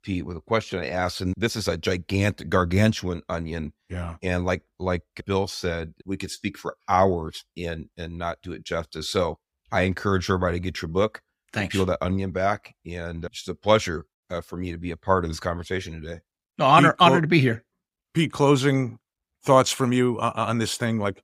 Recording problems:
none

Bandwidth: 15.5 kHz